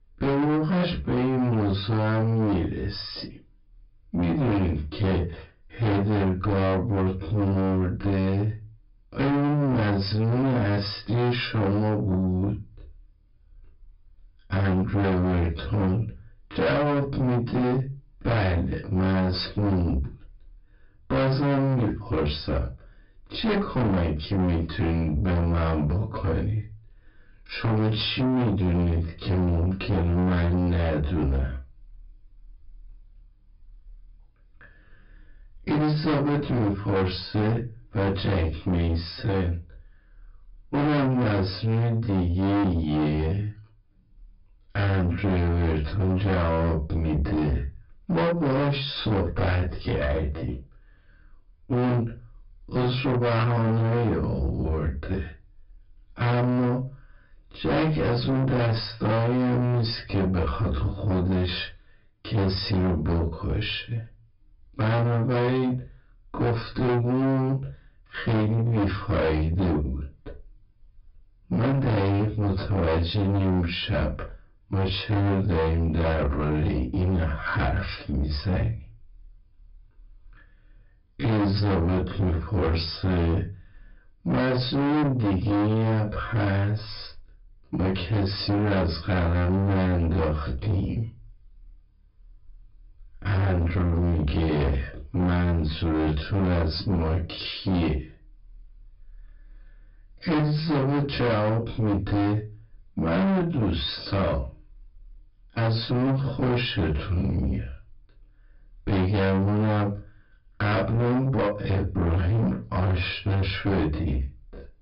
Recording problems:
distortion; heavy; 6 dB below the speech
off-mic speech; far
wrong speed, natural pitch; too slow; 0.5 times normal speed
high frequencies cut off; noticeable; nothing above 5.5 kHz
room echo; very slight; dies away in 0.2 s

